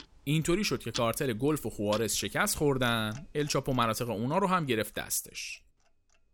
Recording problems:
household noises; noticeable; throughout; 15 dB below the speech

